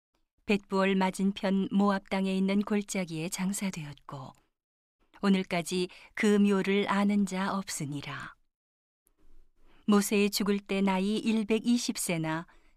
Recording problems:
none

